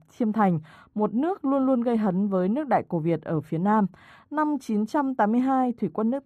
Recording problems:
muffled; very; fading above 2 kHz

